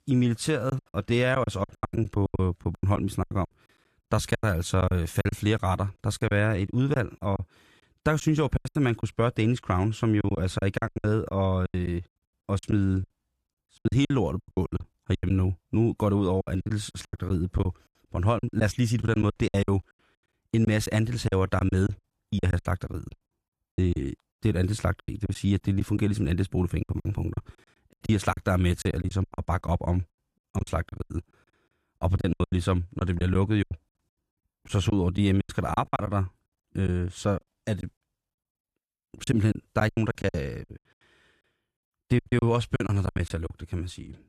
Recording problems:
choppy; very; 17% of the speech affected

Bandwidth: 14 kHz